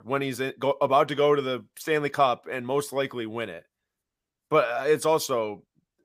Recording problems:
none

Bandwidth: 15 kHz